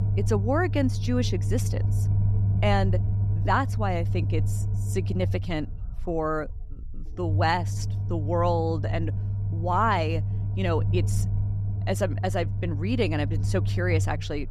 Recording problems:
low rumble; noticeable; throughout; 15 dB below the speech

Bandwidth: 13.5 kHz